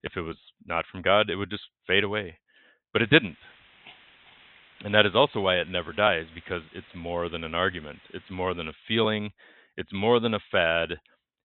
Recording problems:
high frequencies cut off; severe; nothing above 3.5 kHz
hiss; faint; from 3 to 8.5 s; 25 dB below the speech

